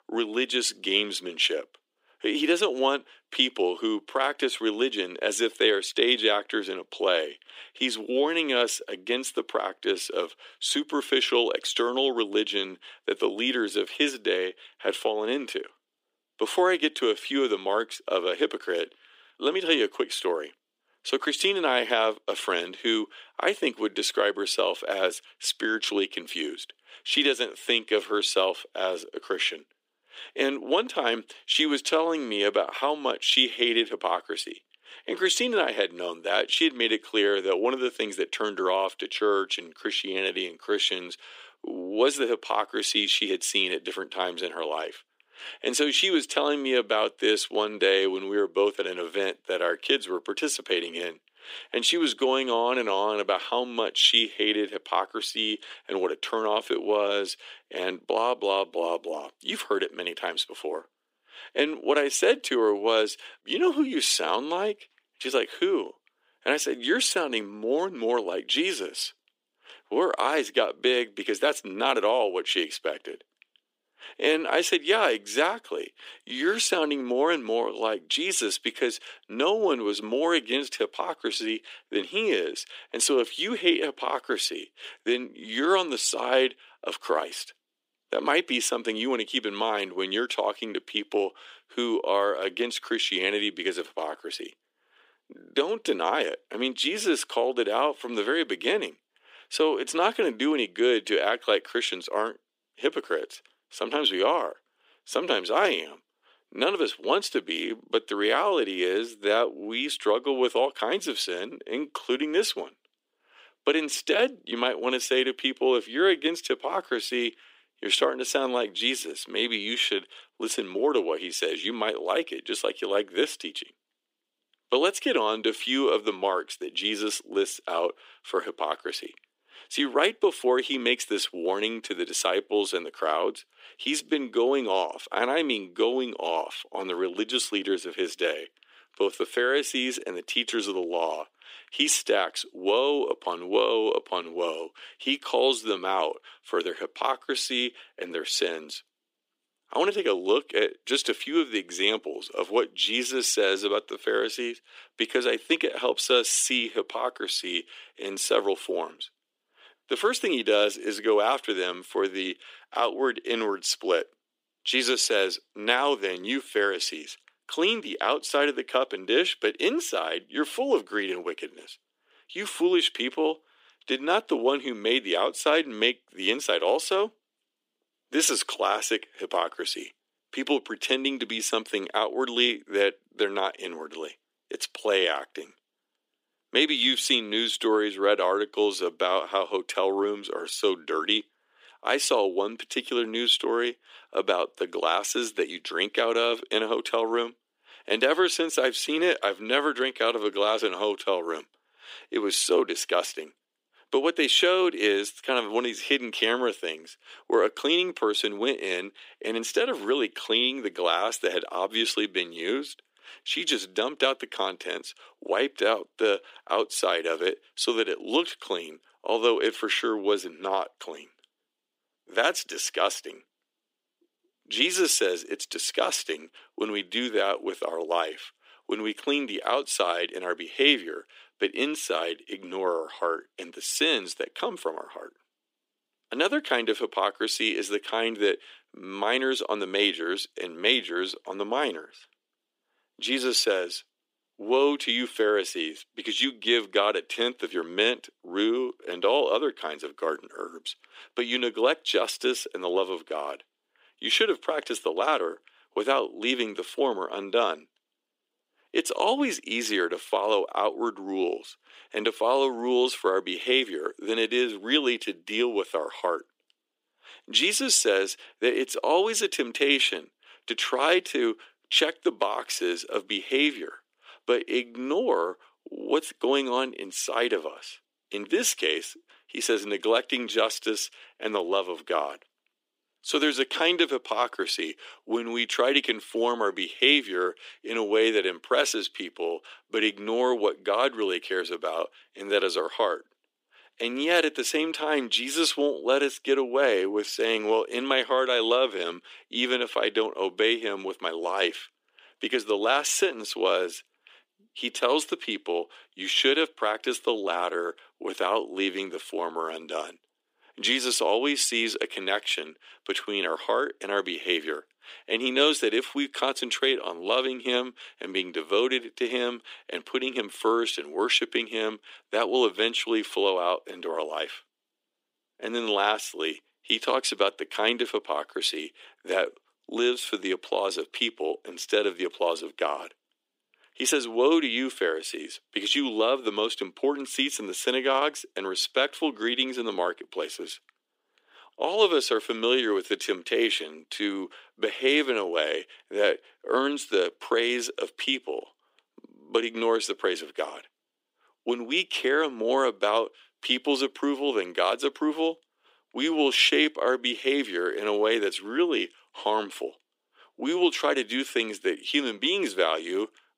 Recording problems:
thin; somewhat; fading below 300 Hz

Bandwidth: 15.5 kHz